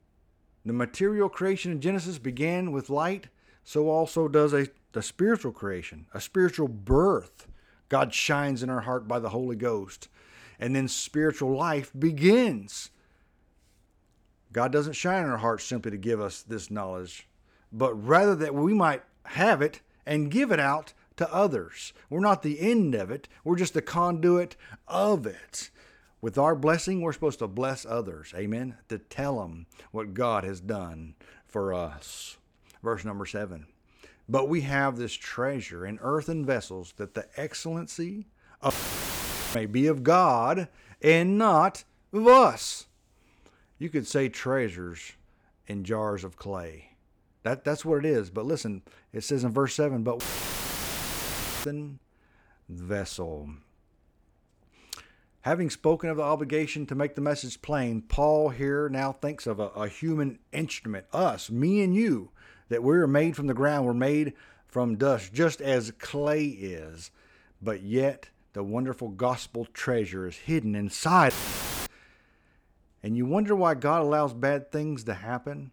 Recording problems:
audio cutting out; filled with static; at 39 s for 1 s, at 50 s for 1.5 s and at 1:11 for 0.5 s

